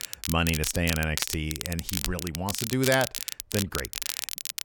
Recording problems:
crackle, like an old record; loud; 3 dB below the speech

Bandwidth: 17.5 kHz